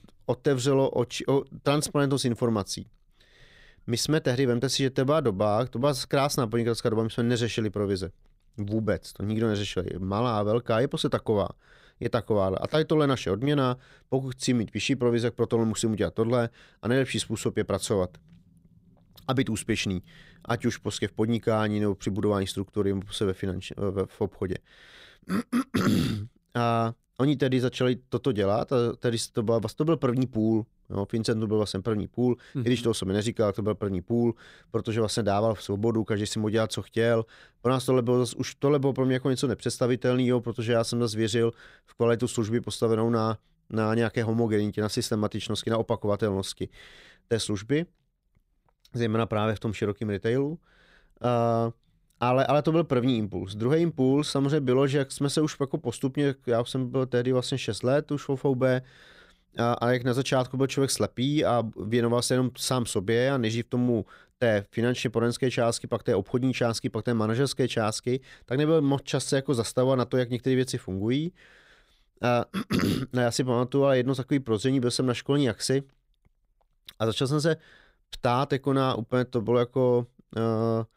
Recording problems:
none

